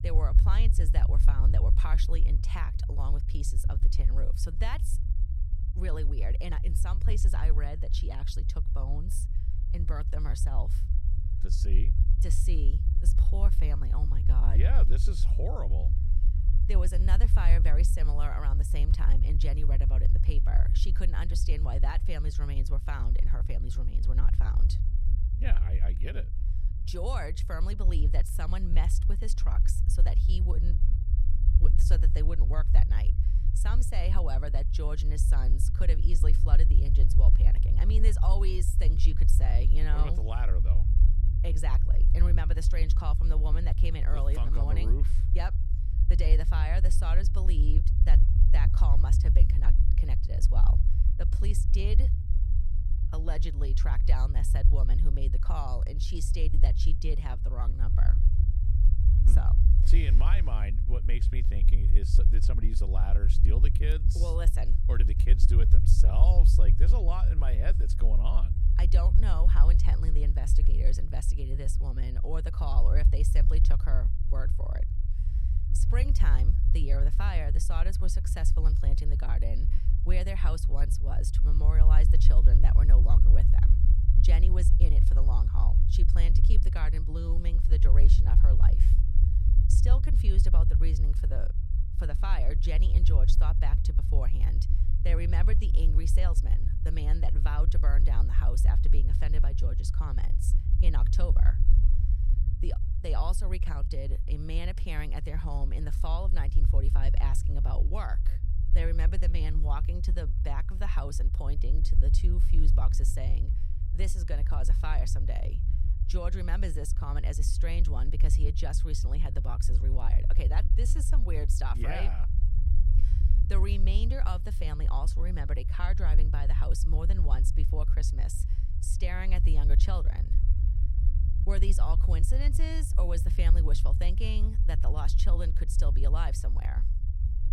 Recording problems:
low rumble; loud; throughout; 5 dB below the speech

